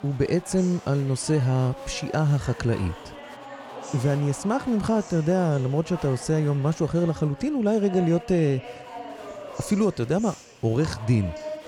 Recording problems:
chatter from many people; noticeable; throughout; 15 dB below the speech

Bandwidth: 18 kHz